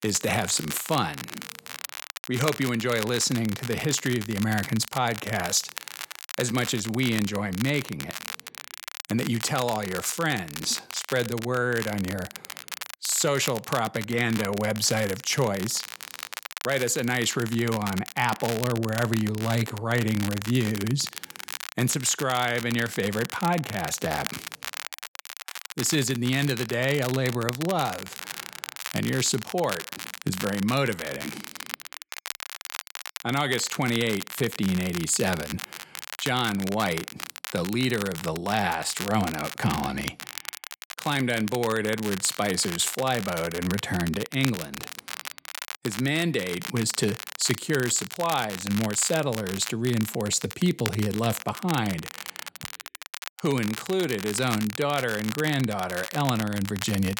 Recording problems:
crackle, like an old record; loud; 10 dB below the speech

